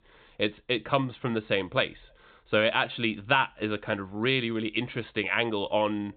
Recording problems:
high frequencies cut off; severe; nothing above 4 kHz

